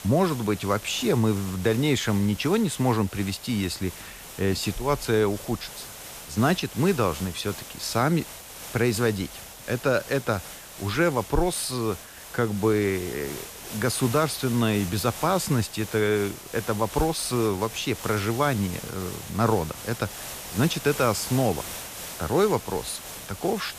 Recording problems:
hiss; noticeable; throughout; 10 dB below the speech

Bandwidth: 14.5 kHz